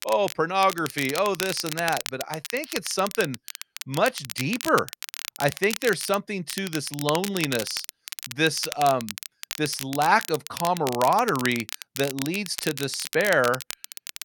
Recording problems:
crackle, like an old record; loud; 9 dB below the speech

